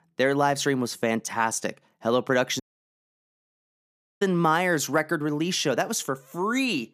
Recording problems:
audio cutting out; at 2.5 s for 1.5 s

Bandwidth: 14.5 kHz